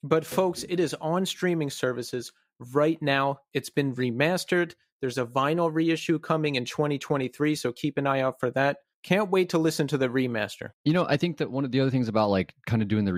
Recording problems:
abrupt cut into speech; at the end

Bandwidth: 15.5 kHz